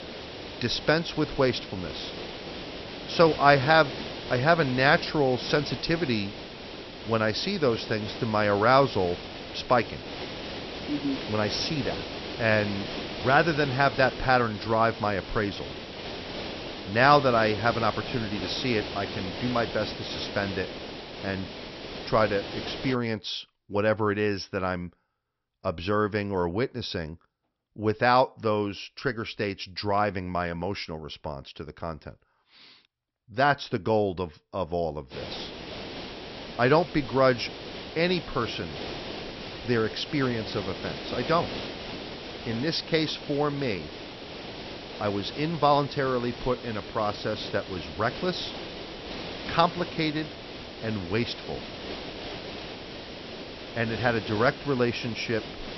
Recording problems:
high frequencies cut off; noticeable; nothing above 5.5 kHz
hiss; noticeable; until 23 s and from 35 s on; 10 dB below the speech

